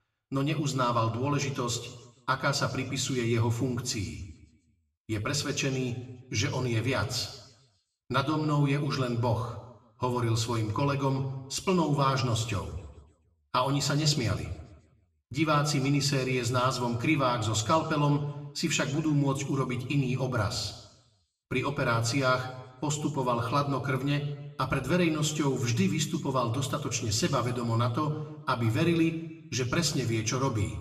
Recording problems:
room echo; very slight; dies away in 0.9 s
off-mic speech; somewhat distant

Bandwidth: 14 kHz